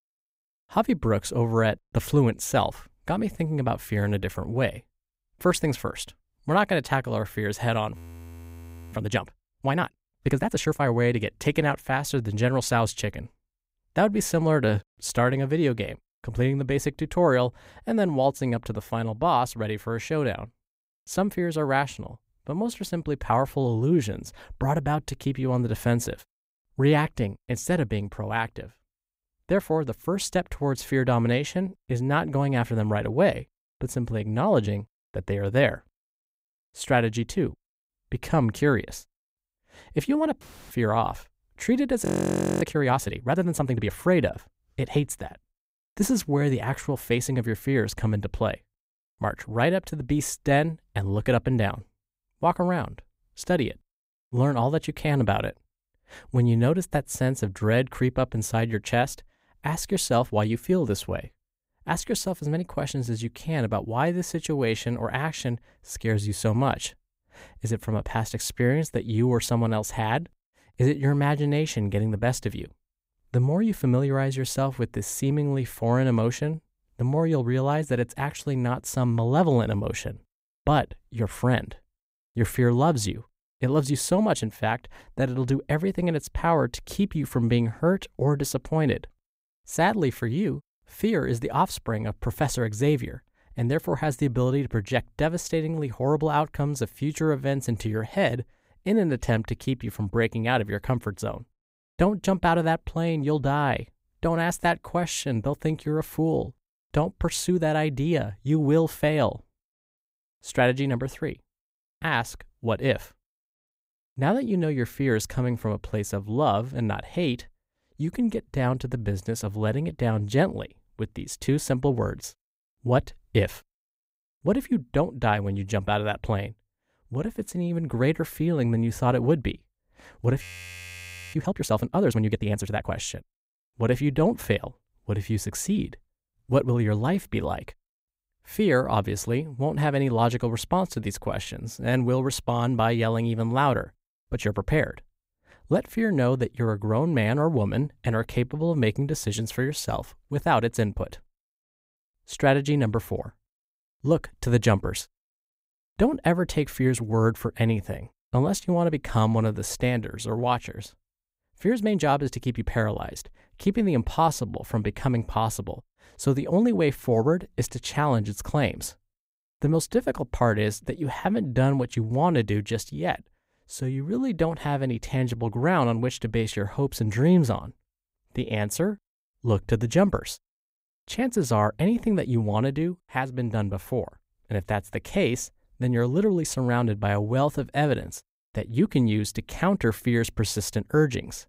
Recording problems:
audio freezing; at 8 s for 1 s, at 42 s for 0.5 s and at 2:10 for 1 s

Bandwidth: 15.5 kHz